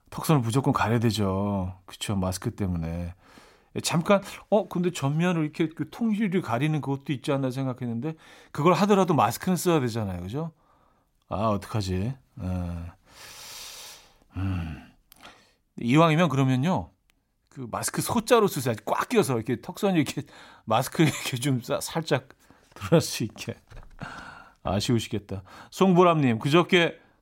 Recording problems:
none

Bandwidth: 16 kHz